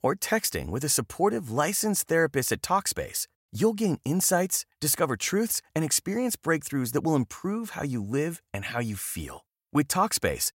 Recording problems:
none

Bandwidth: 16 kHz